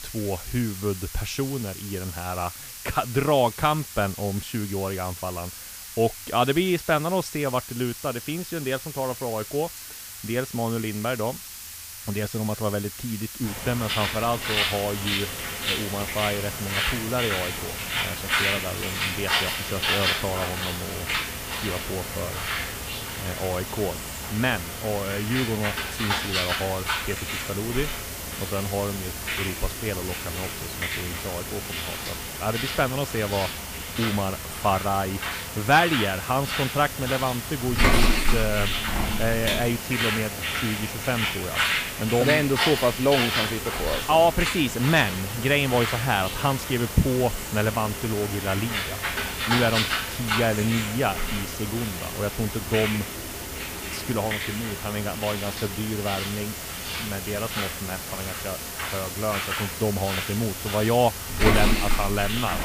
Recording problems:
animal sounds; loud; throughout; 2 dB below the speech
hiss; loud; throughout; 8 dB below the speech

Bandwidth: 15 kHz